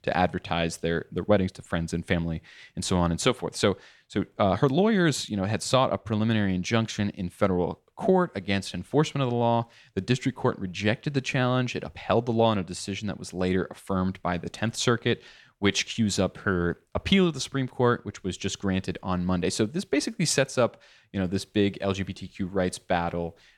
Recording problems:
none

